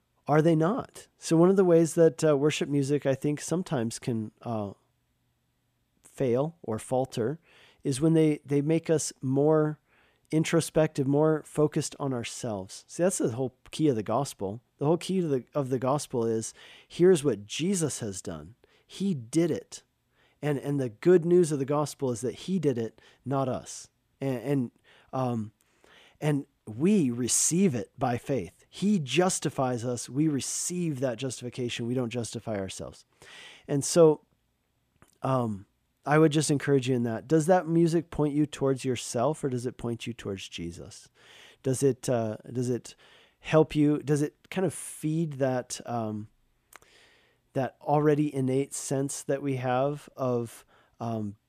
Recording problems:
none

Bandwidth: 14.5 kHz